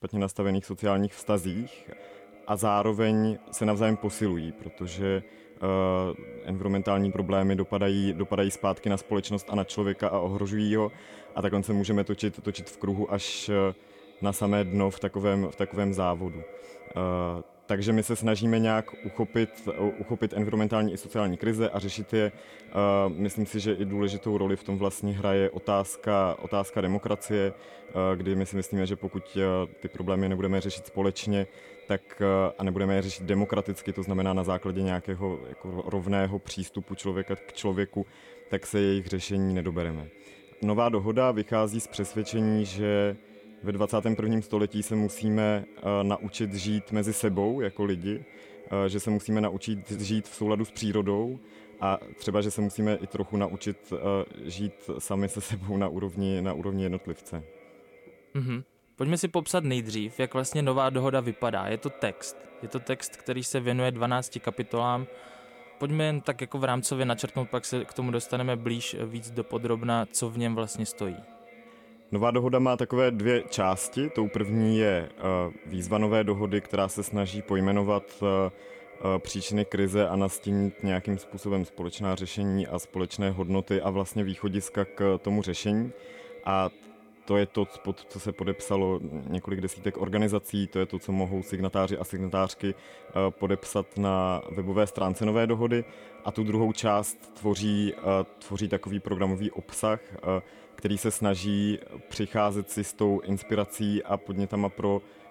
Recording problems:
echo of what is said; faint; throughout; 330 ms later, 20 dB below the speech

